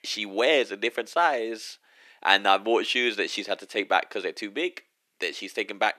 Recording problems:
thin; somewhat; fading below 350 Hz

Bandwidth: 14.5 kHz